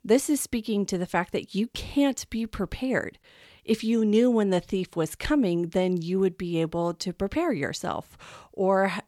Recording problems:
none

